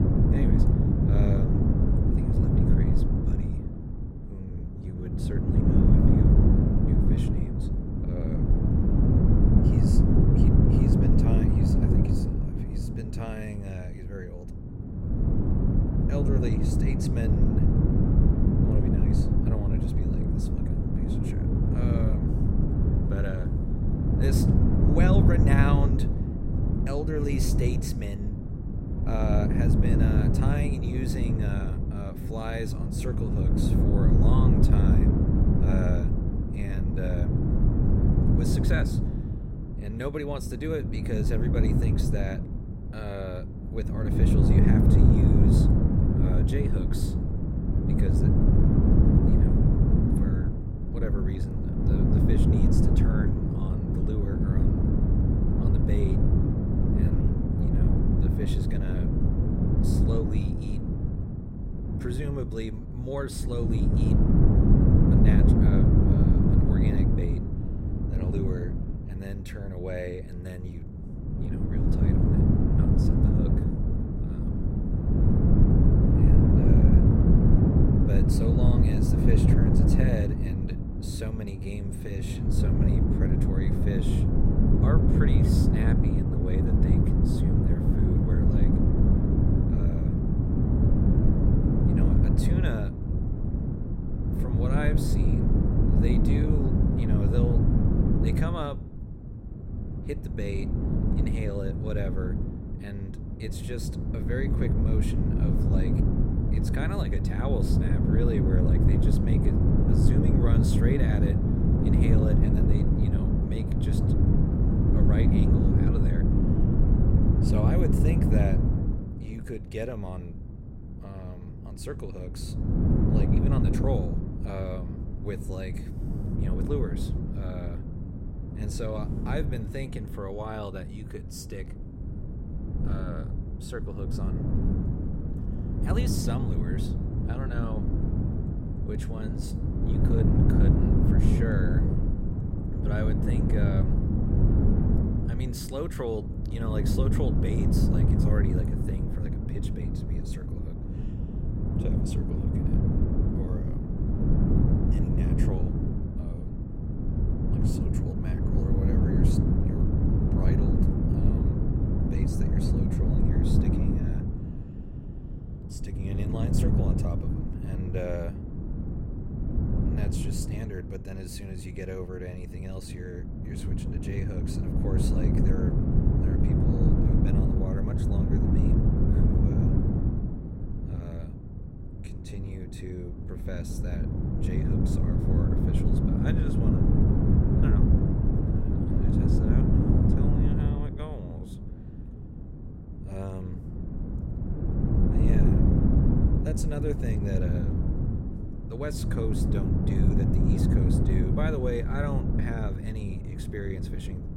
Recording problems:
wind noise on the microphone; heavy; 4 dB above the speech

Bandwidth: 16 kHz